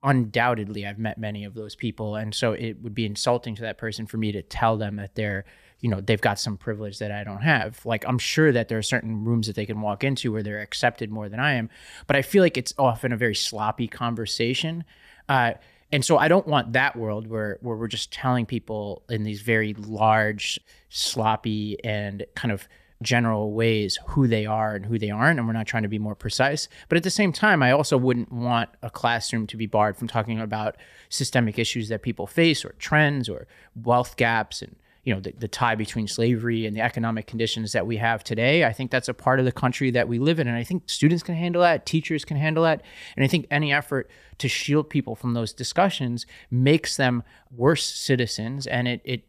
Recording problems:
none

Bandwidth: 14.5 kHz